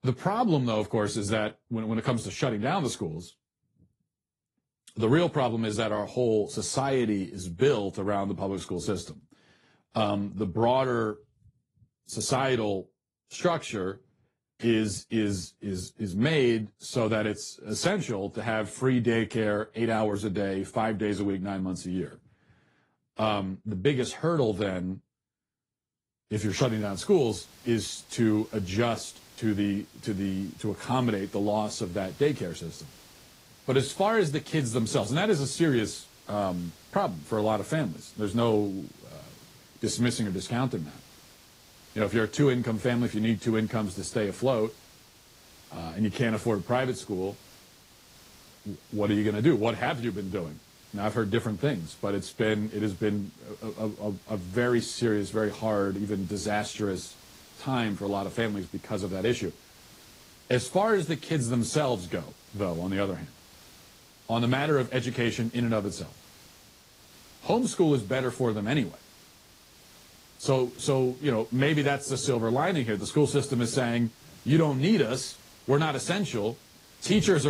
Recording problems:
garbled, watery; slightly; nothing above 11 kHz
hiss; faint; from 26 s on; 25 dB below the speech
abrupt cut into speech; at the end

